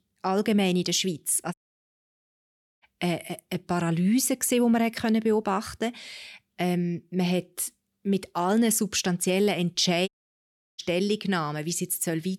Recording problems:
audio cutting out; at 1.5 s for 1.5 s and at 10 s for 0.5 s

